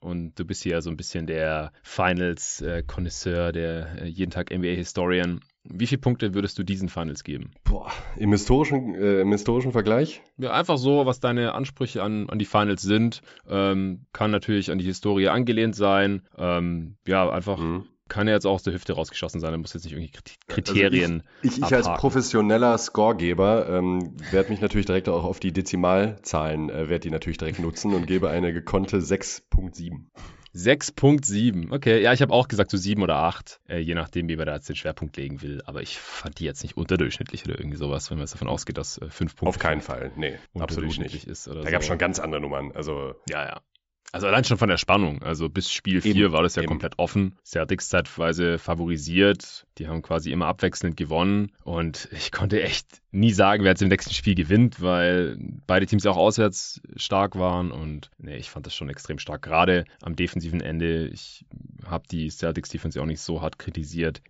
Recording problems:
high frequencies cut off; noticeable; nothing above 8 kHz

